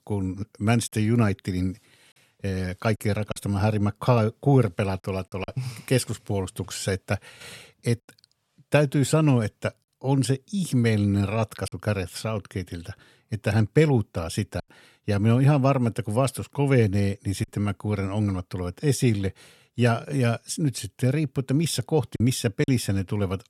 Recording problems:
choppy; occasionally; 2% of the speech affected

